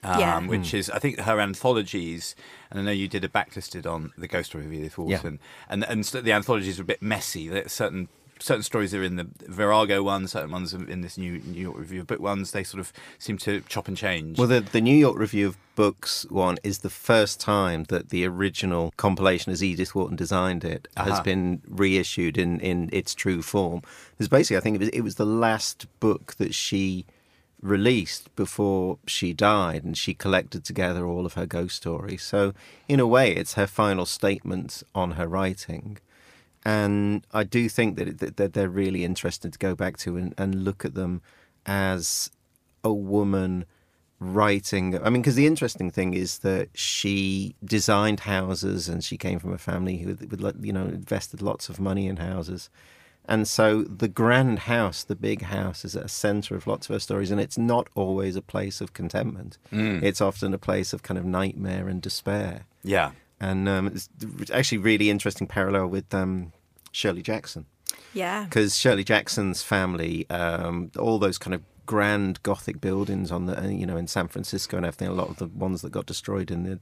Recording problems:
none

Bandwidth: 15 kHz